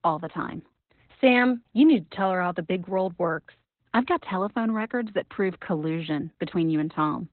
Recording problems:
garbled, watery; badly; nothing above 4 kHz

